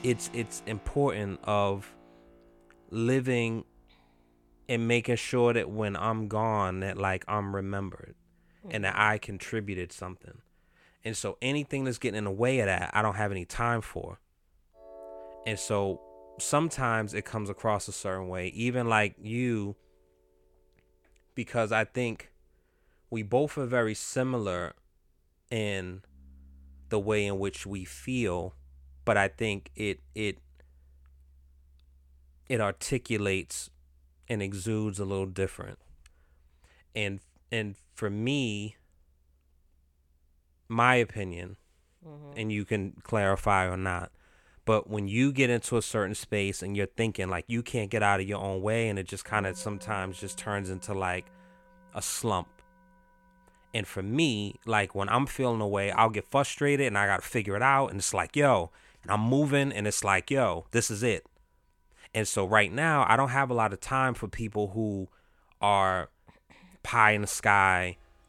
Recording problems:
background music; faint; throughout; 25 dB below the speech

